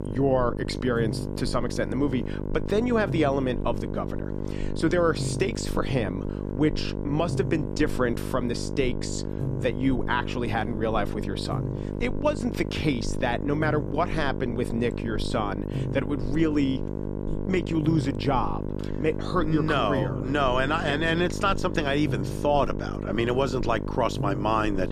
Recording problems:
electrical hum; loud; throughout; 50 Hz, 9 dB below the speech

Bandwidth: 14.5 kHz